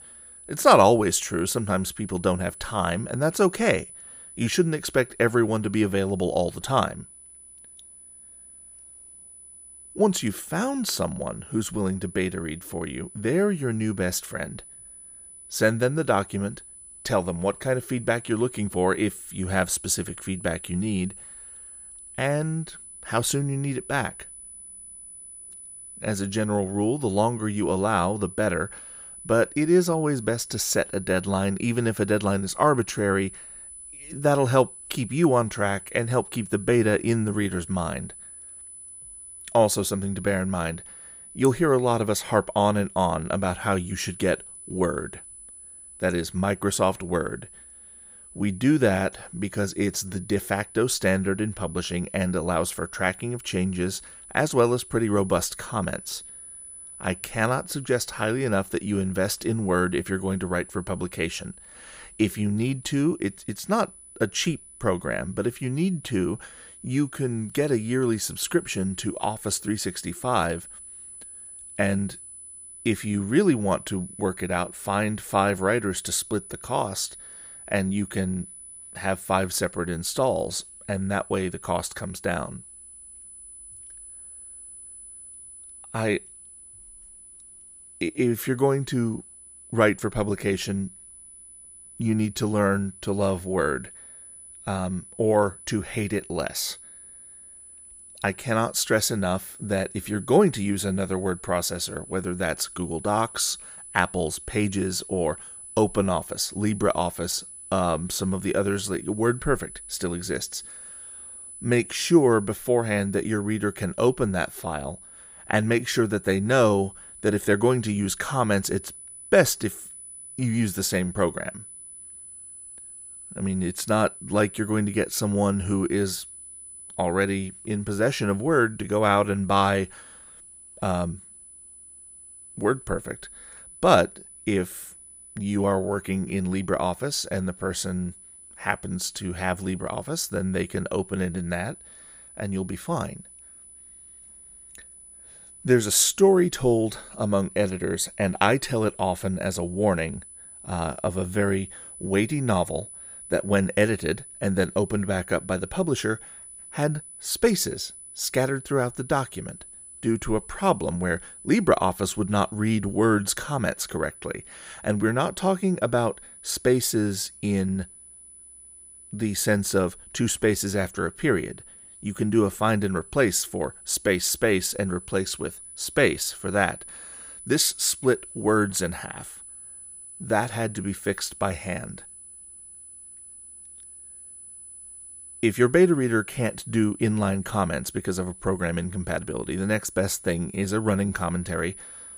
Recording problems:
high-pitched whine; noticeable; throughout; 10 kHz, 15 dB below the speech

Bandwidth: 15.5 kHz